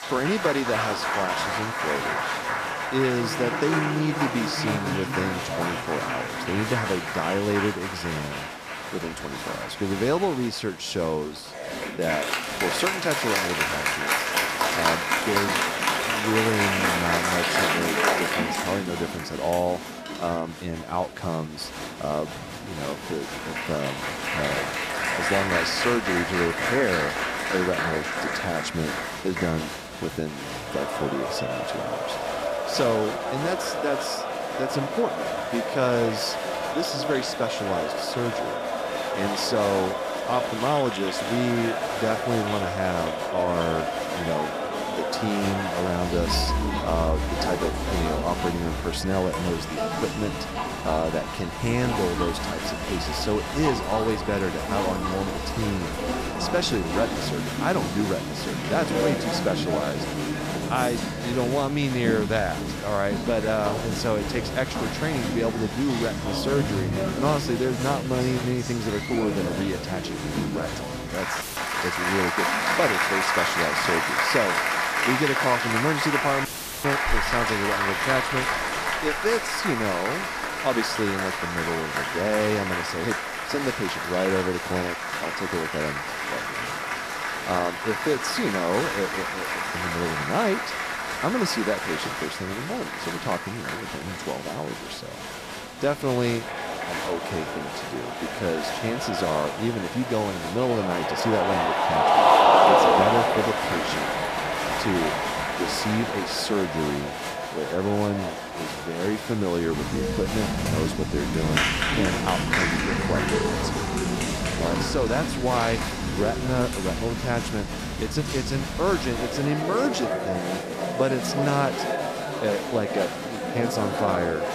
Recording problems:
crowd noise; very loud; throughout; 1 dB above the speech
audio cutting out; filled with static; at 1:11 and at 1:16

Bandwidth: 14.5 kHz